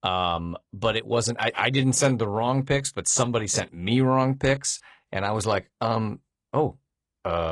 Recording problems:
garbled, watery; slightly; nothing above 10 kHz
abrupt cut into speech; at the end

